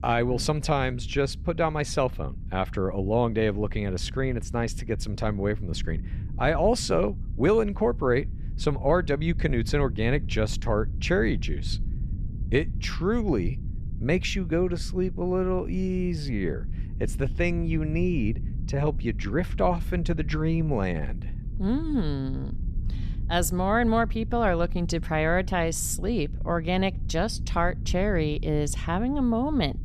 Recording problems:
low rumble; faint; throughout; 20 dB below the speech

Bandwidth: 14 kHz